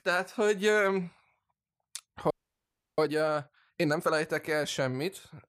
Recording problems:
audio freezing; at 2.5 s for 0.5 s

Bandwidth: 14.5 kHz